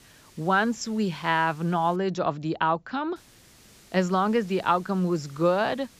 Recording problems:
high frequencies cut off; noticeable; nothing above 8 kHz
hiss; faint; until 2 s and from 3 s on; 25 dB below the speech

